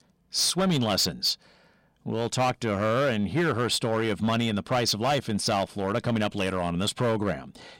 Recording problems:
distortion; slight; 9% of the sound clipped

